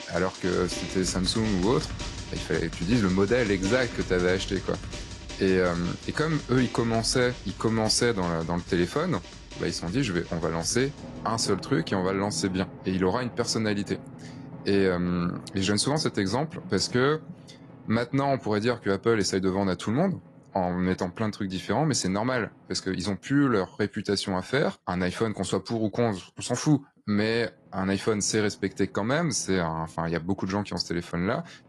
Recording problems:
garbled, watery; slightly
background music; noticeable; throughout; 15 dB below the speech

